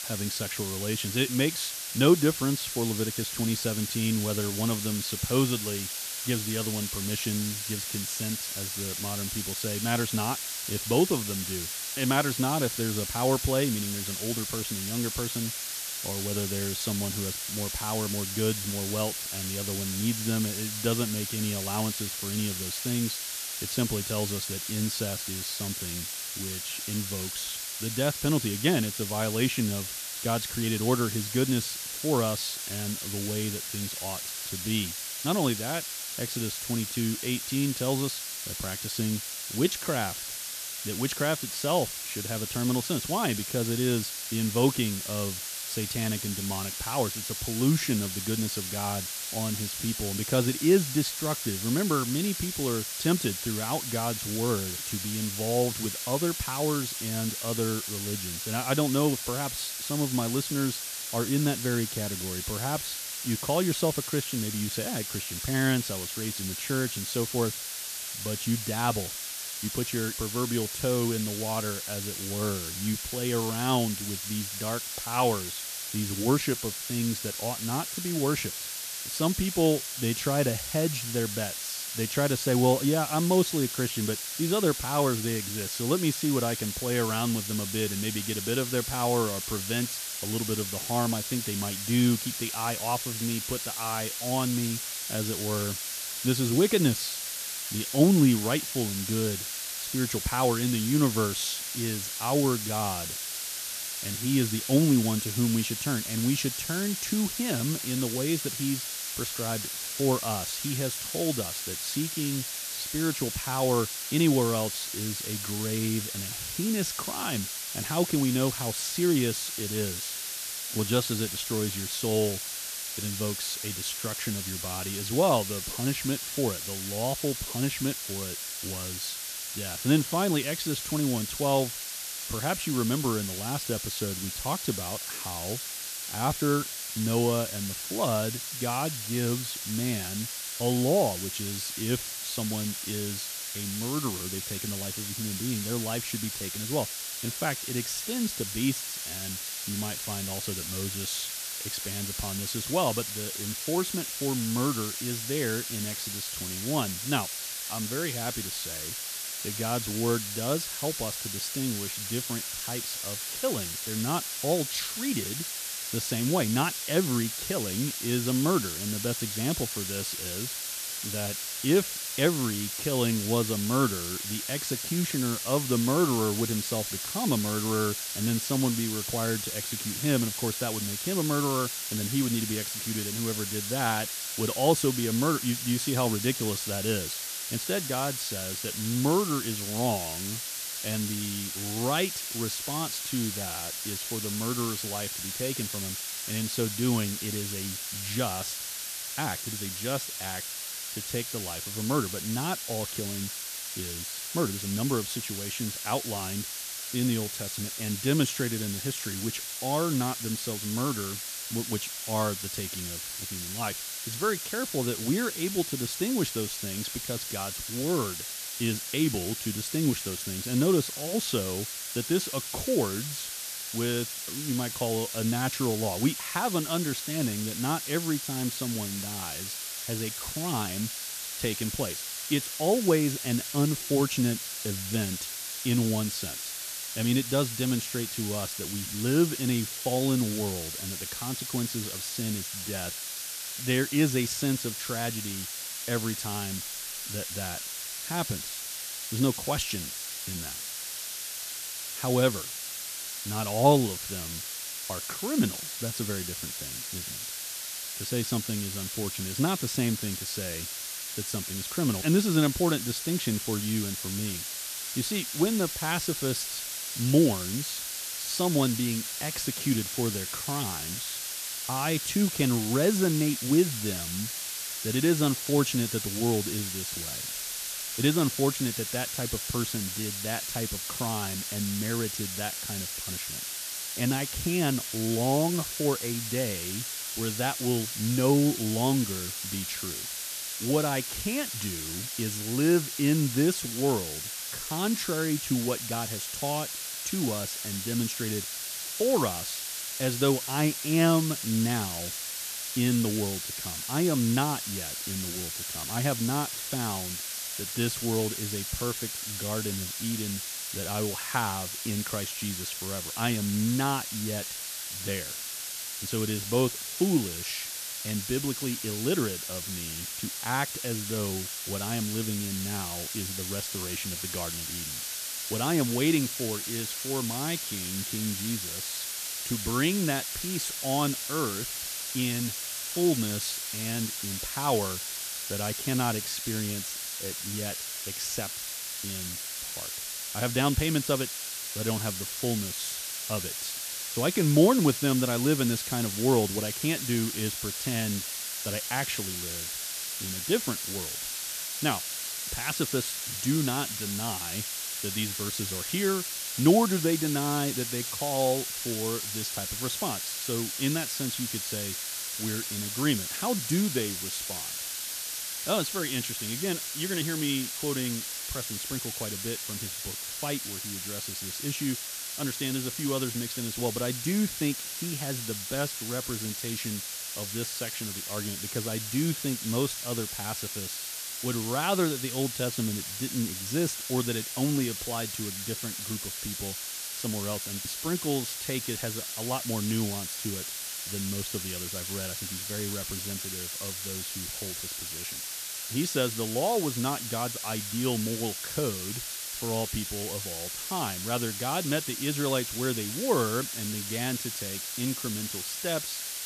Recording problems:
hiss; loud; throughout; 2 dB below the speech

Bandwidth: 14.5 kHz